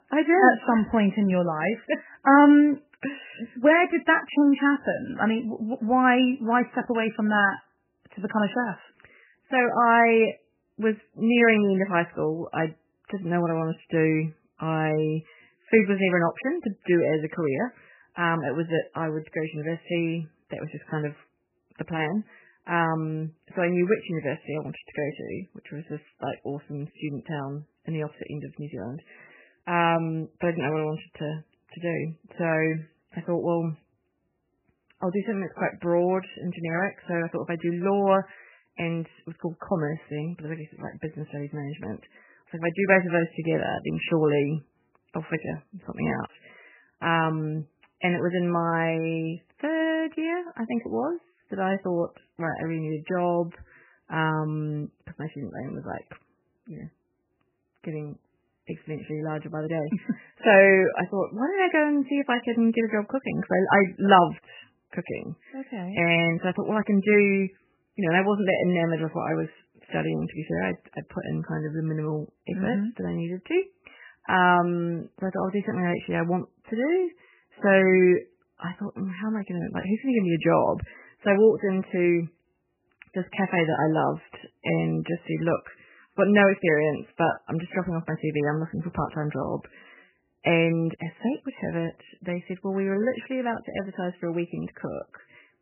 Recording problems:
garbled, watery; badly; nothing above 3 kHz

